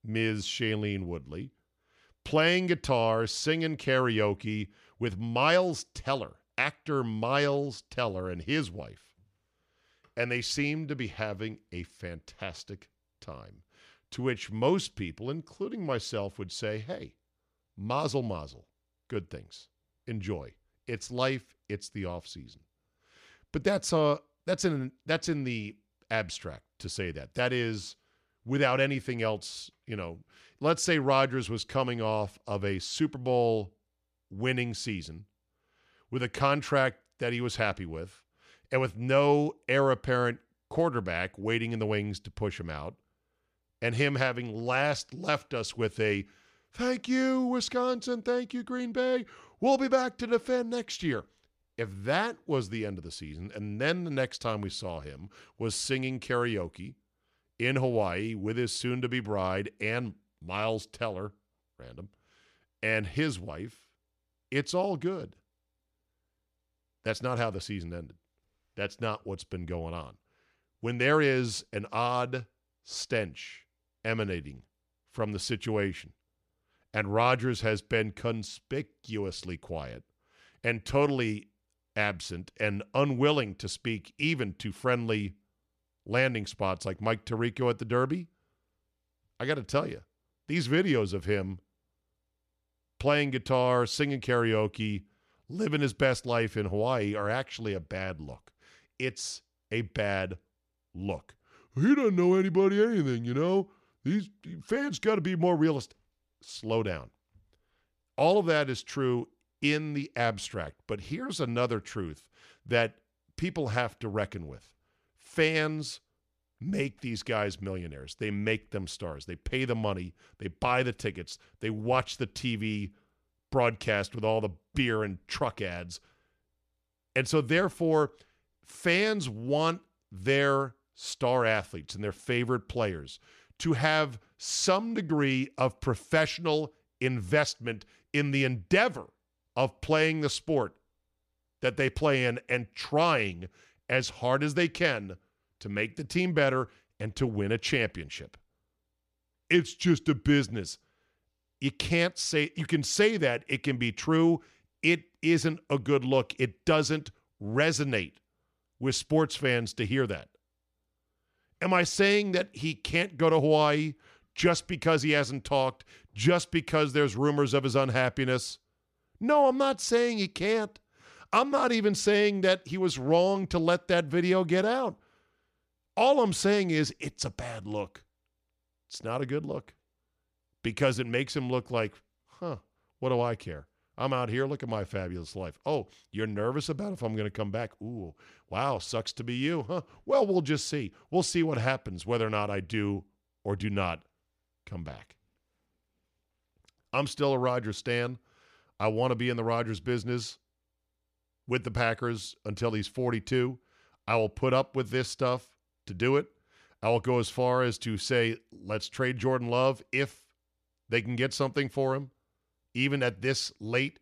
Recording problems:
none

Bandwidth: 14.5 kHz